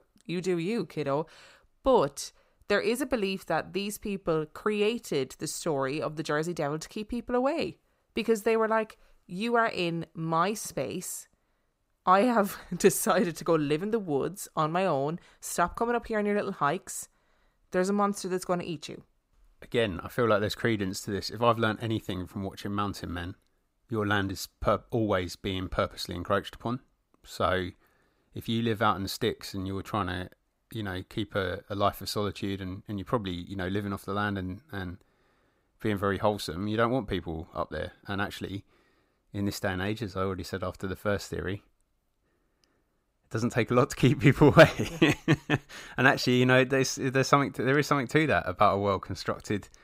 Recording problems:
none

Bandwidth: 15.5 kHz